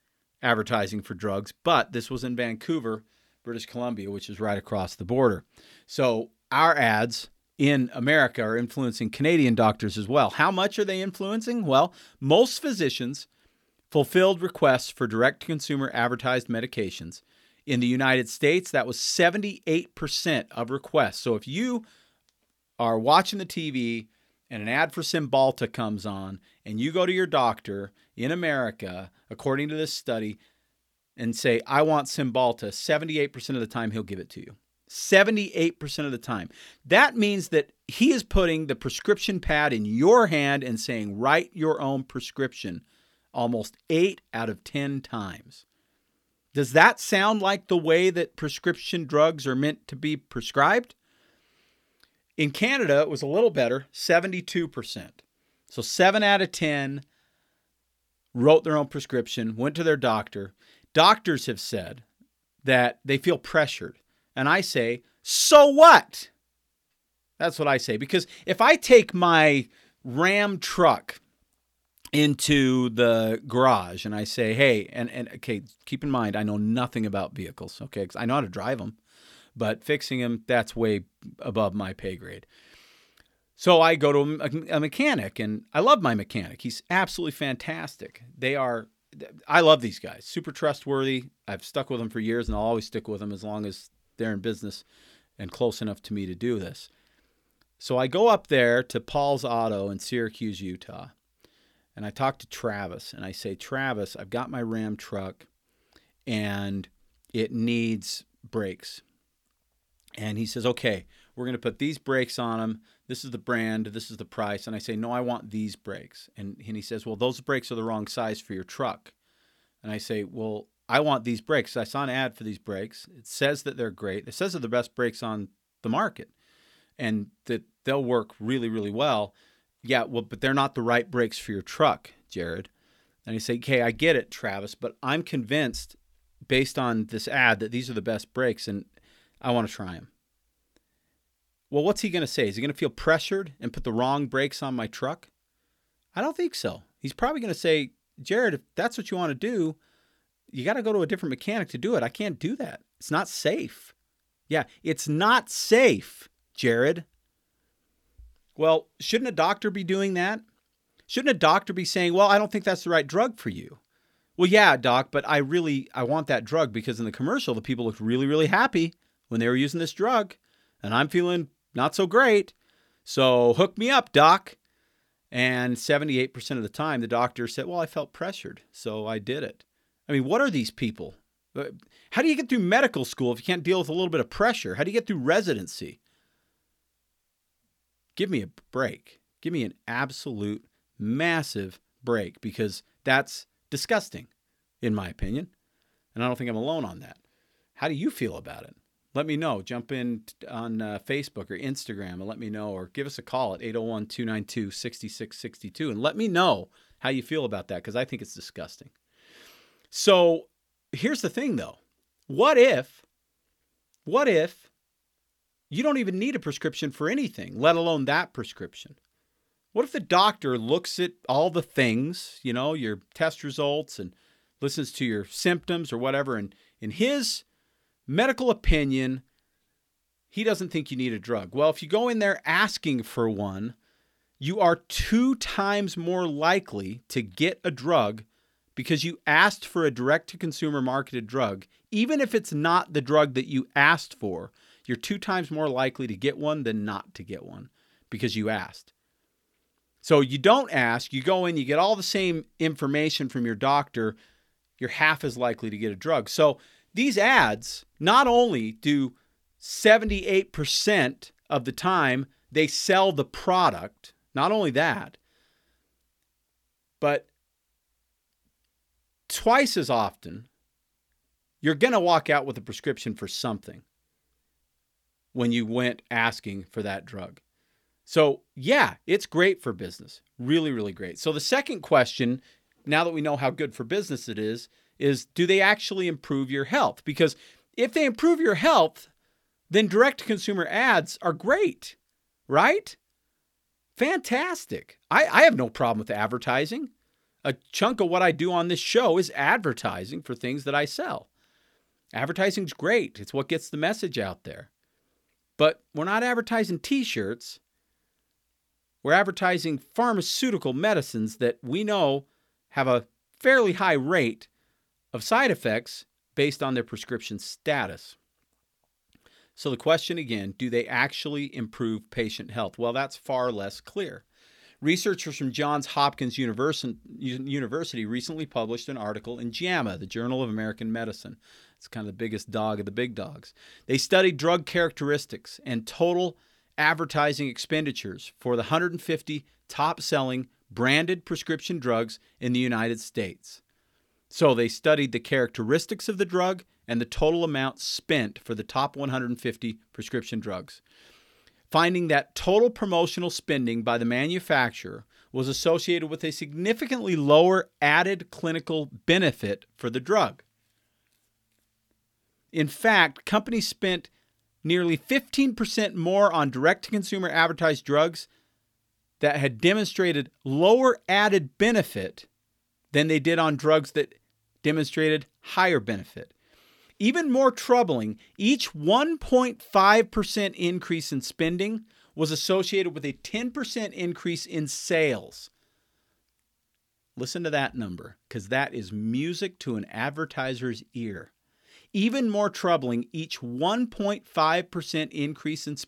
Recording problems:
none

